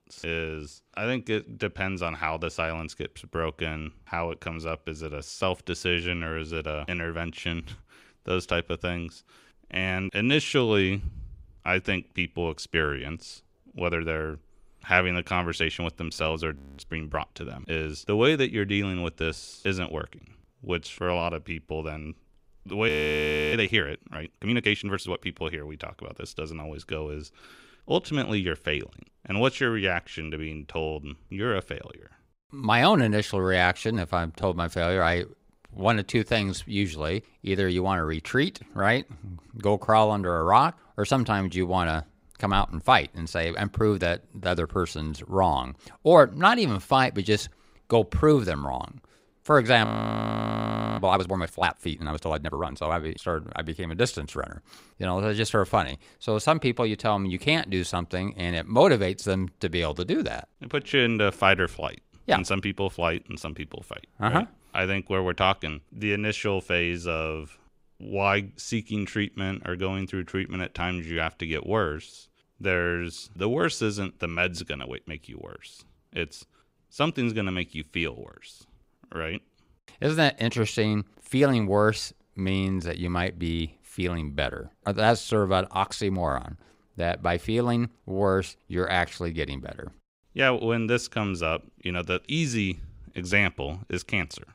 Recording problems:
audio freezing; at 17 s, at 23 s for 0.5 s and at 50 s for 1 s

